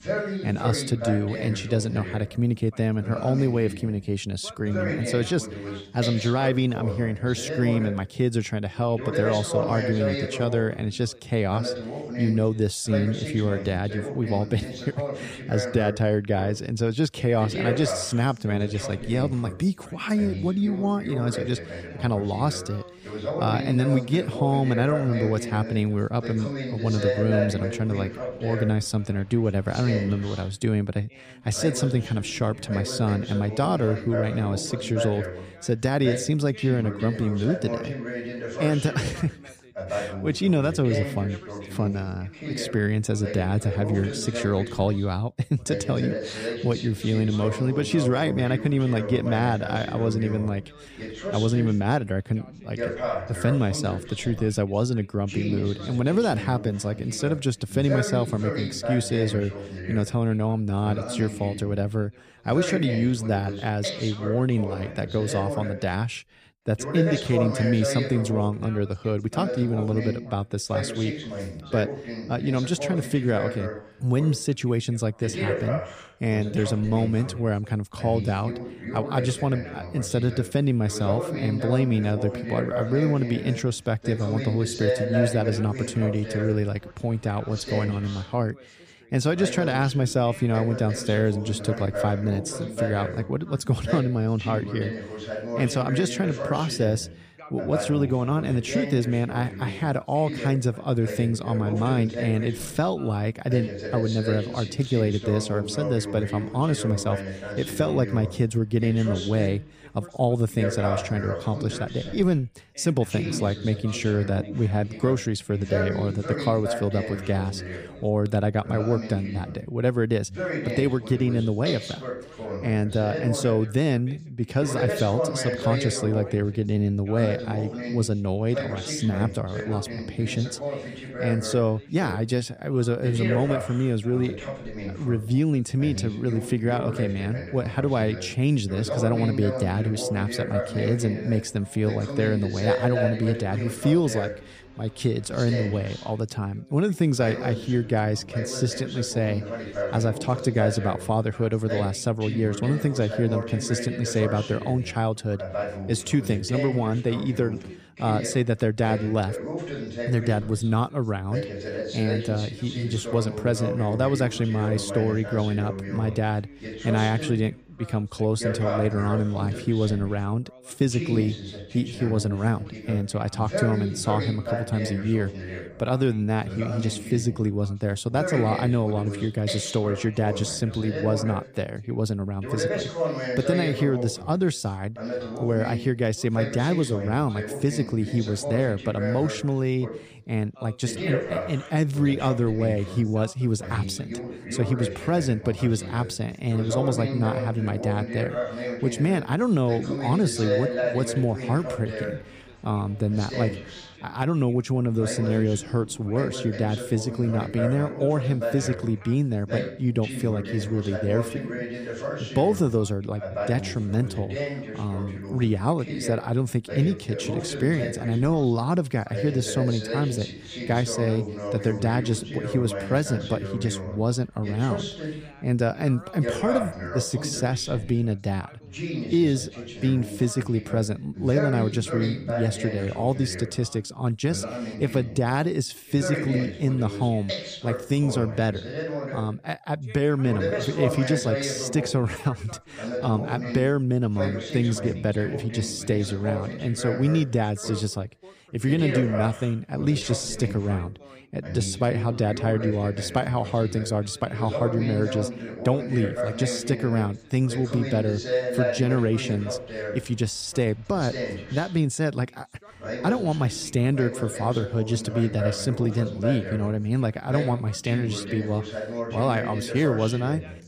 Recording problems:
background chatter; loud; throughout; 2 voices, 7 dB below the speech

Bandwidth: 14.5 kHz